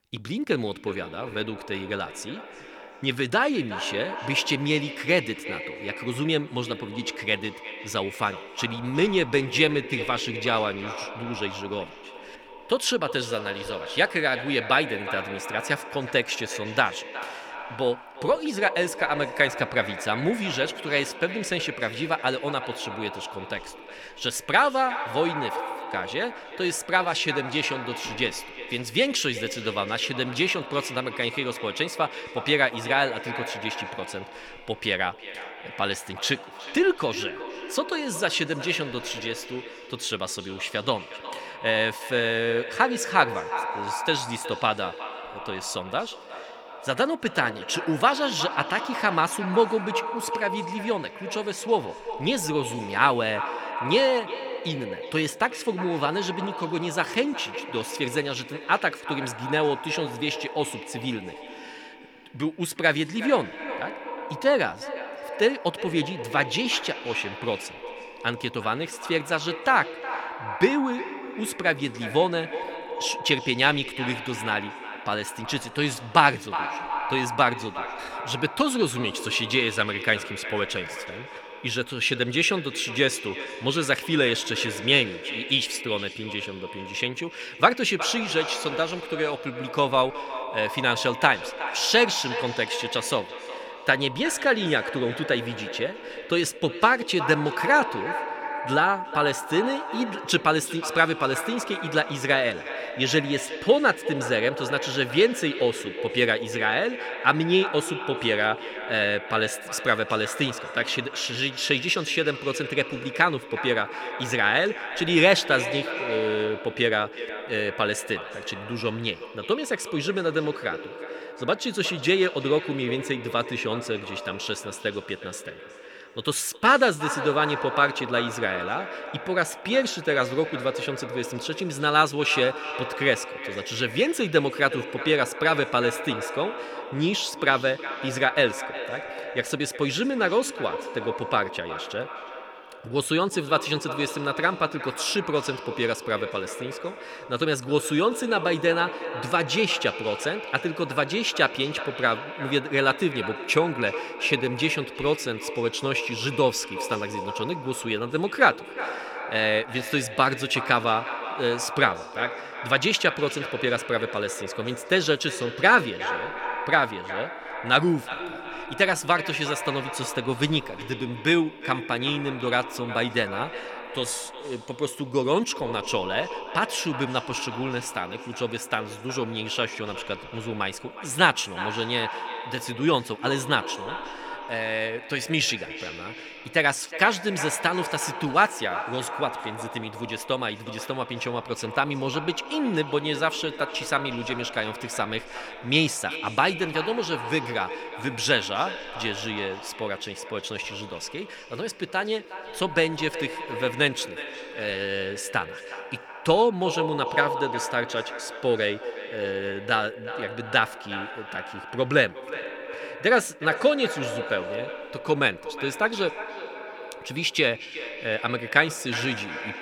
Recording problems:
echo of what is said; strong; throughout; 360 ms later, 9 dB below the speech

